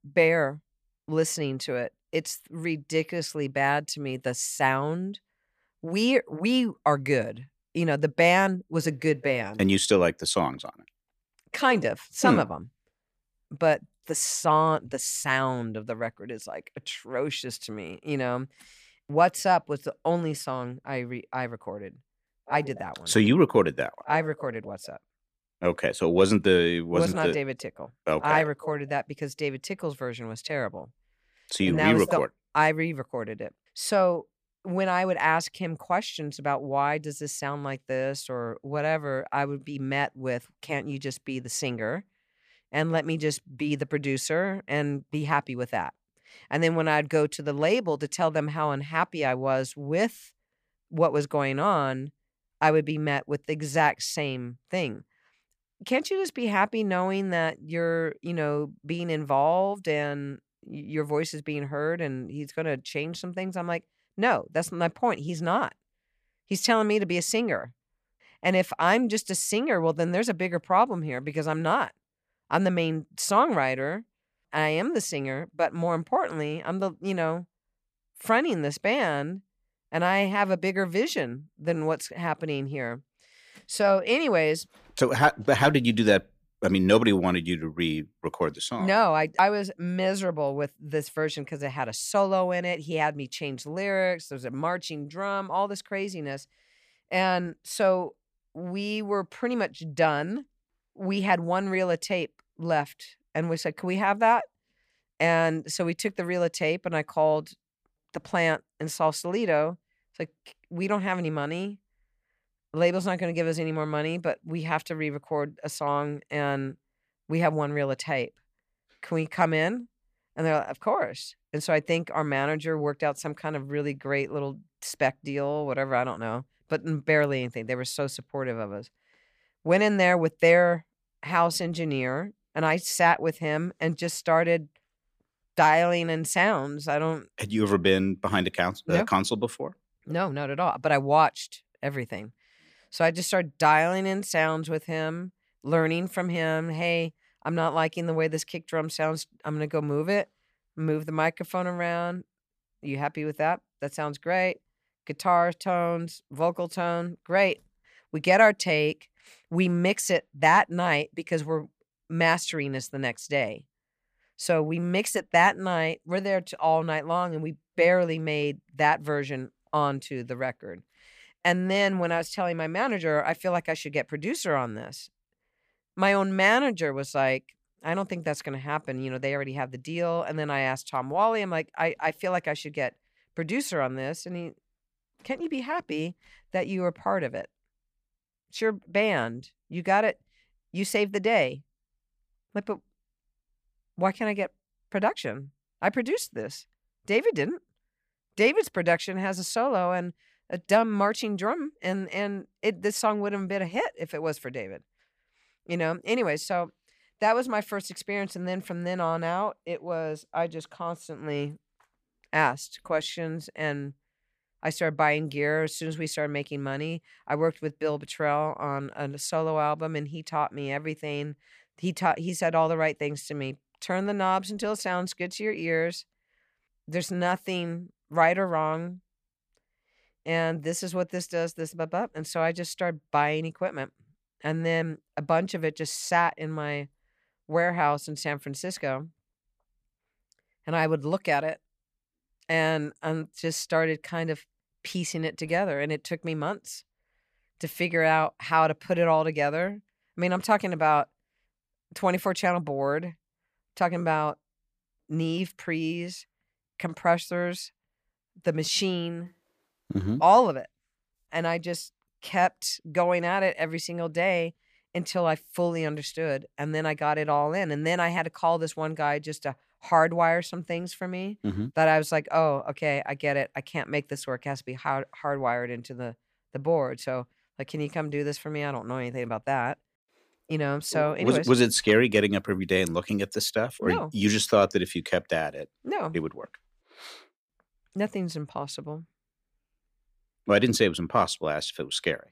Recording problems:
none

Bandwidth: 15 kHz